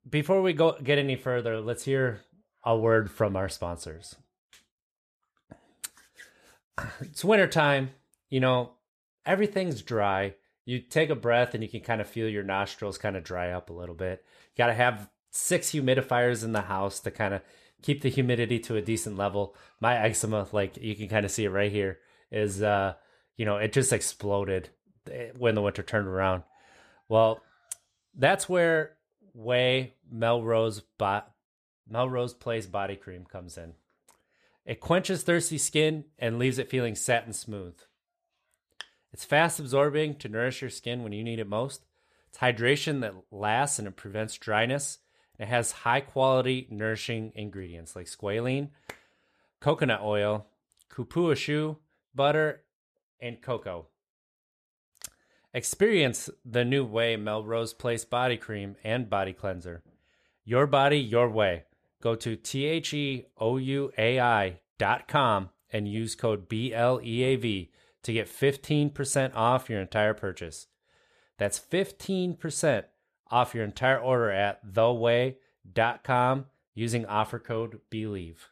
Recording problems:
none

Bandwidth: 14.5 kHz